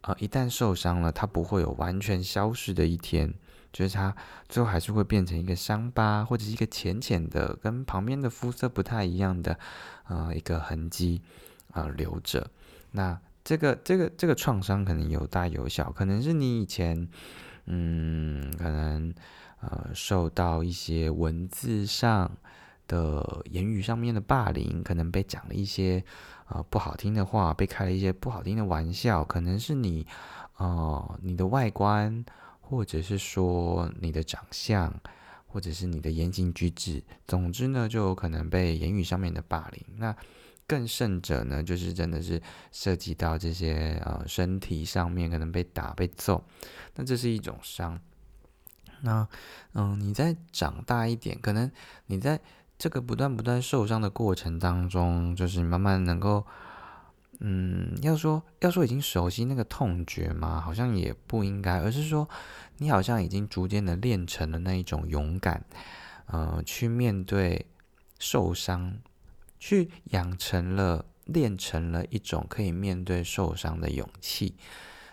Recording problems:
none

